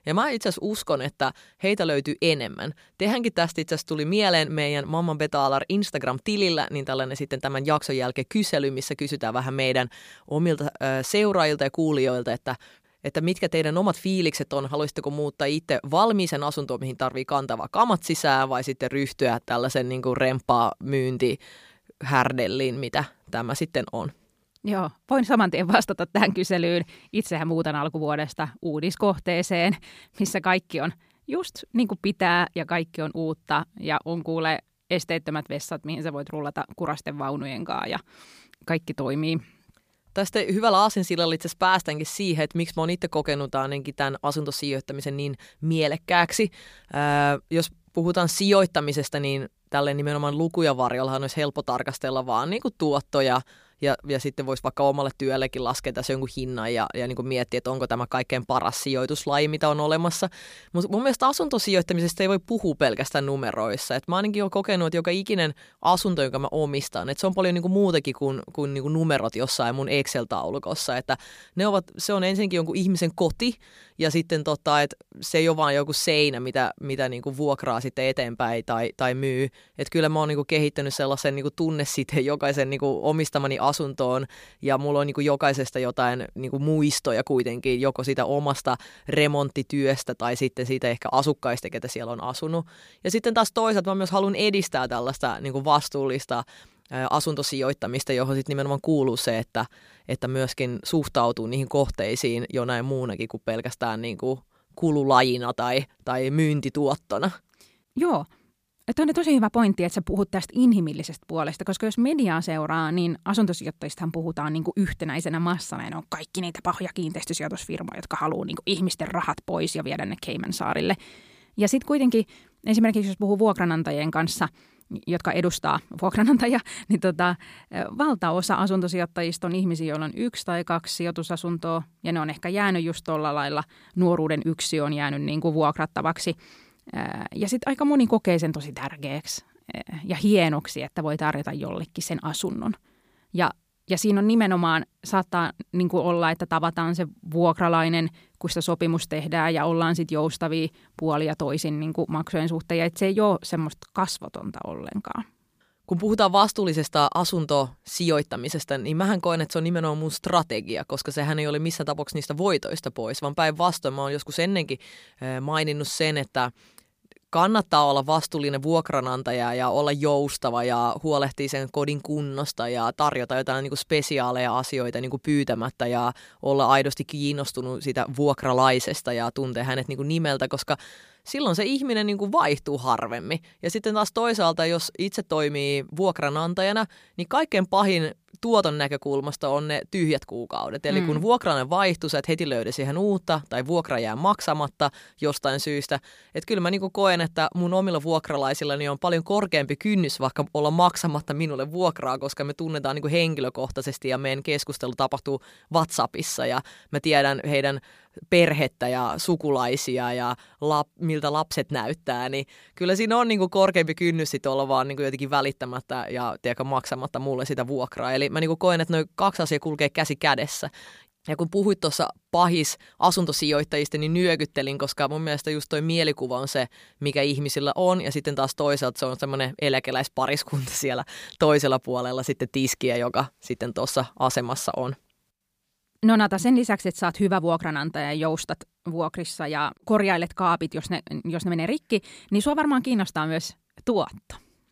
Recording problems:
none

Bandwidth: 15 kHz